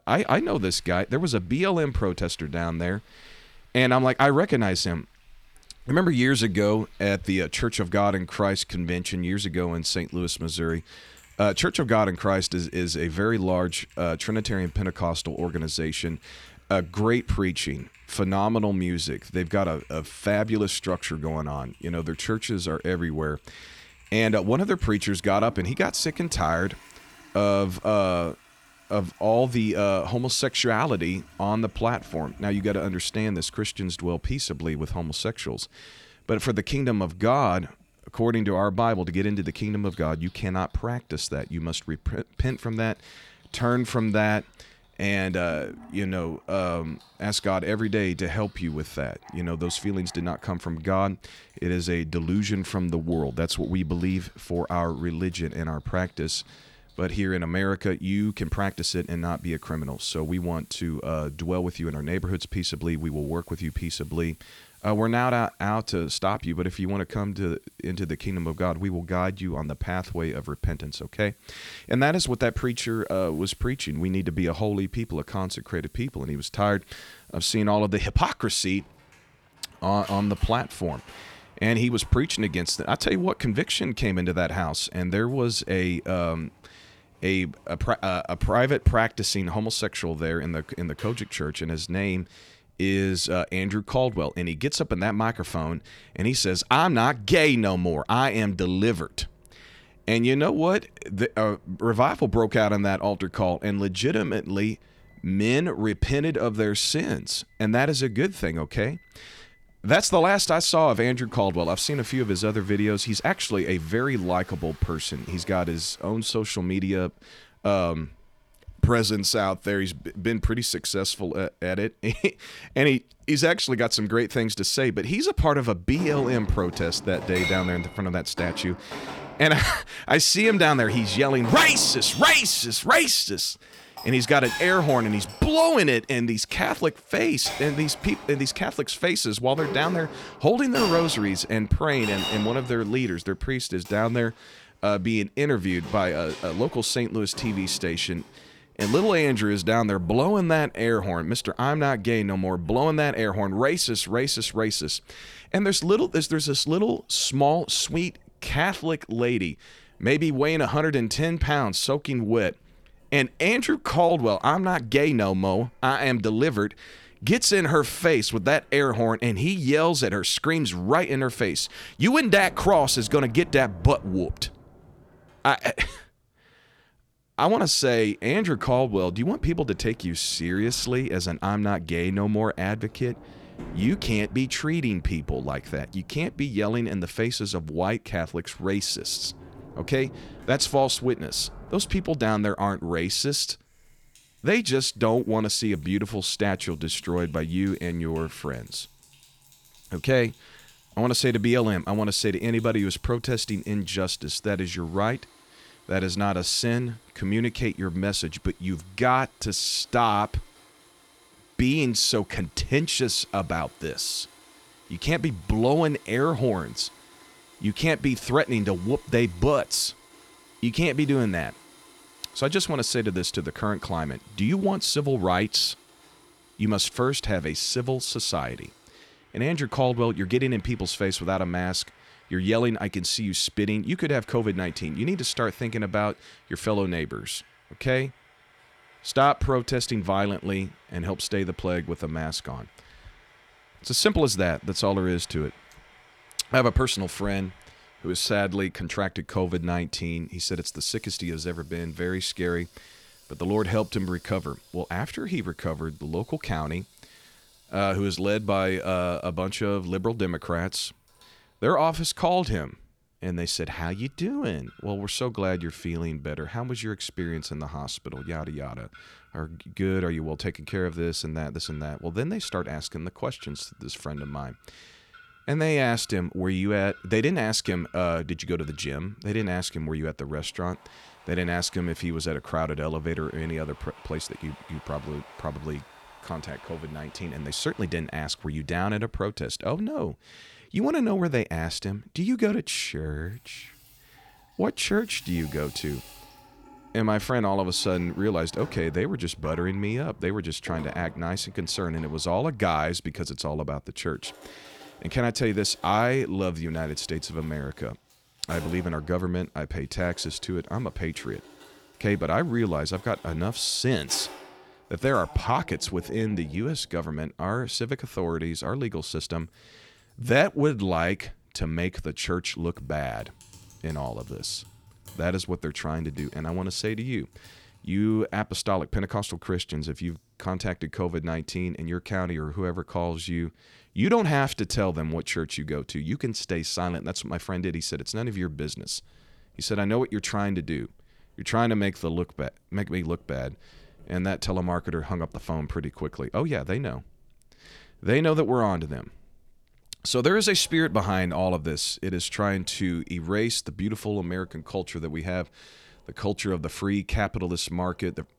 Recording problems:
household noises; noticeable; throughout; 20 dB below the speech

